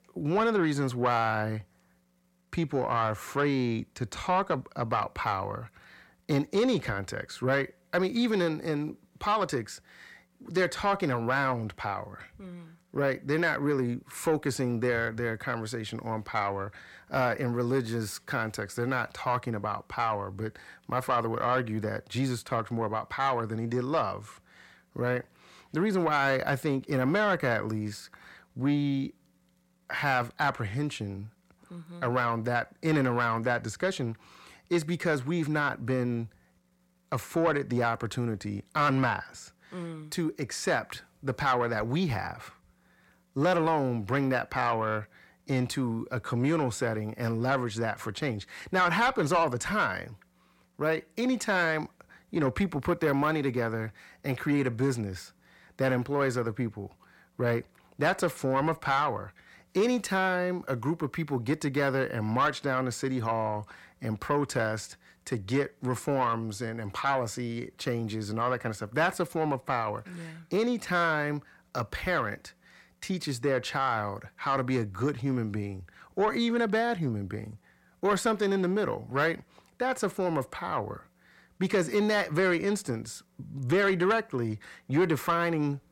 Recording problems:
distortion; slight; 10 dB below the speech

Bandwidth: 16.5 kHz